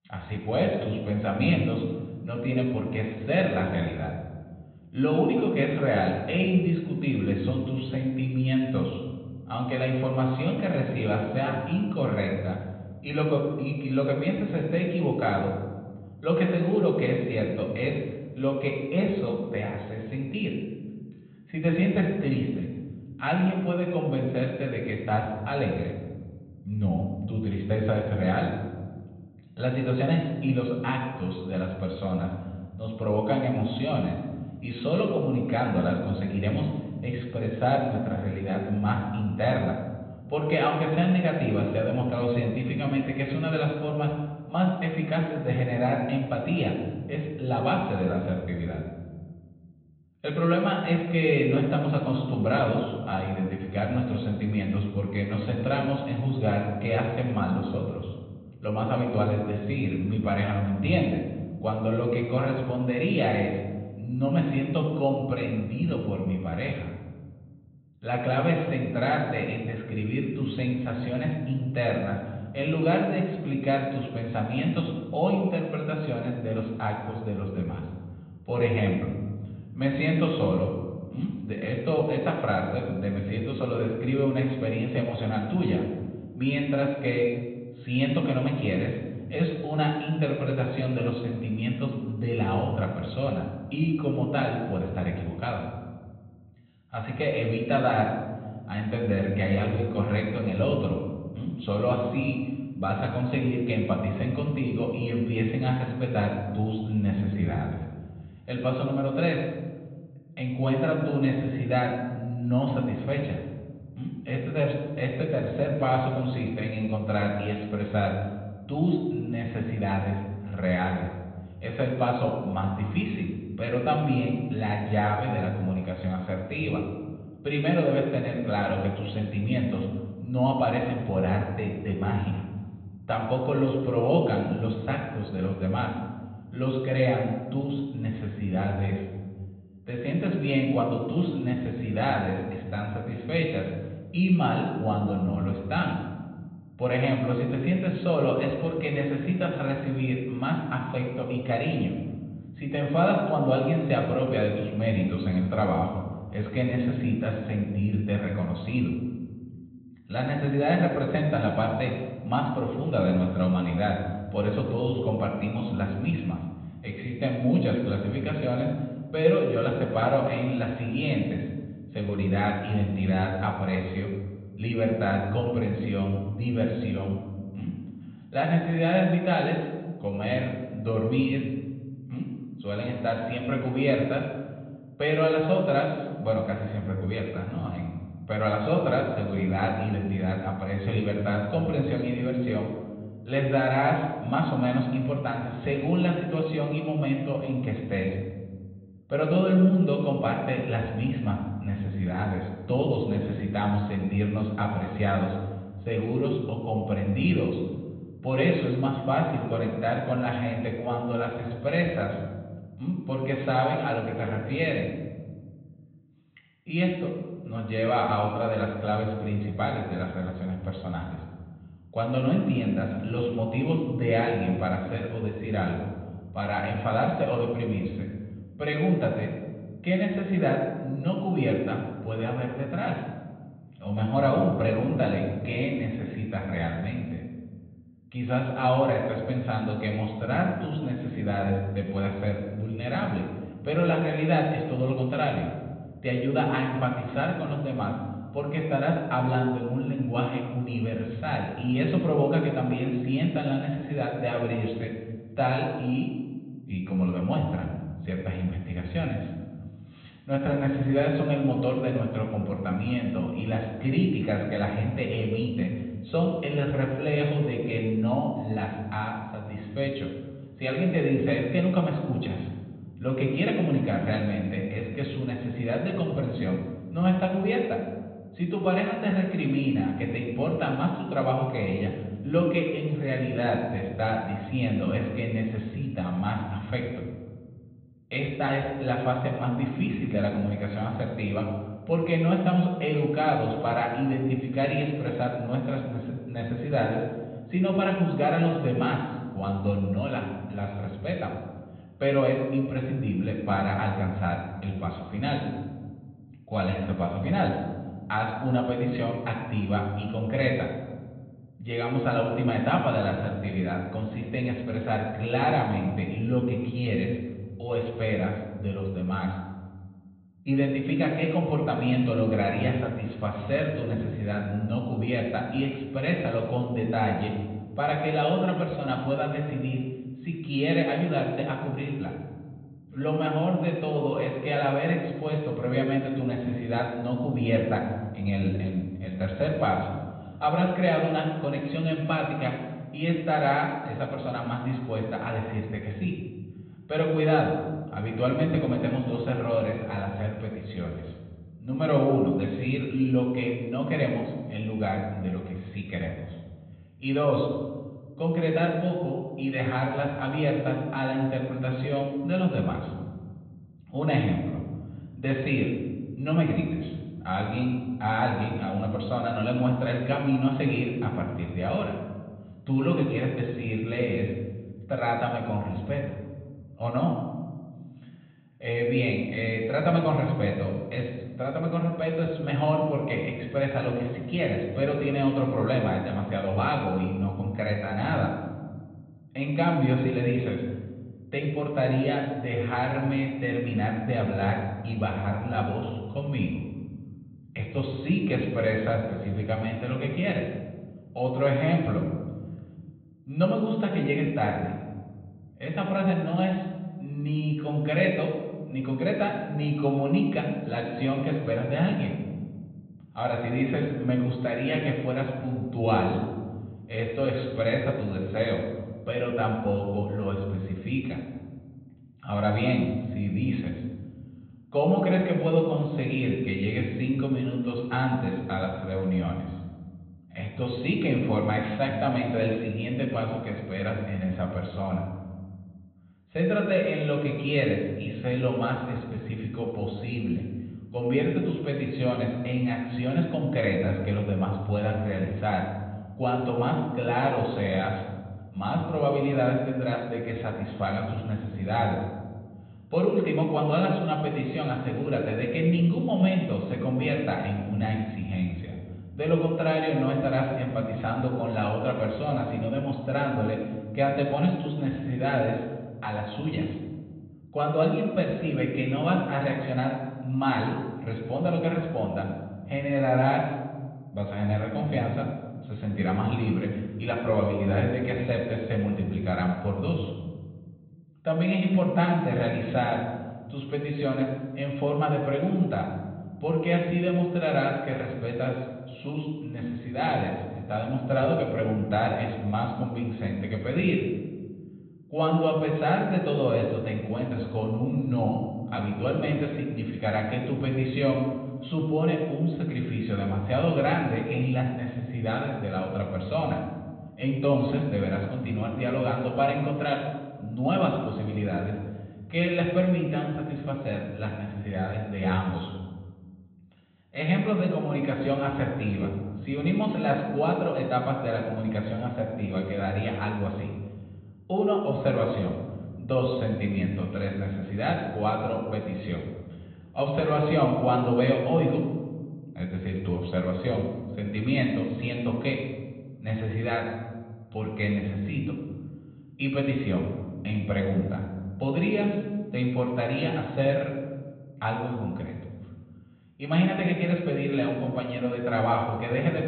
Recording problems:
high frequencies cut off; severe; nothing above 4 kHz
room echo; noticeable; dies away in 1.3 s
off-mic speech; somewhat distant

